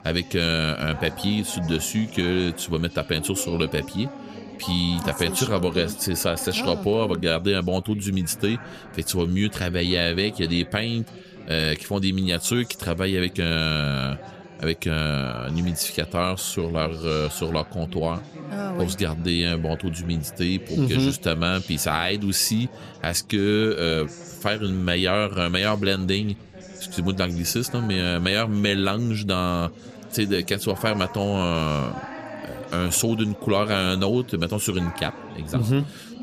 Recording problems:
background chatter; noticeable; throughout; 3 voices, 15 dB below the speech

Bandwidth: 14.5 kHz